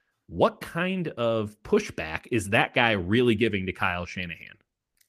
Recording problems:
none

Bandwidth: 15 kHz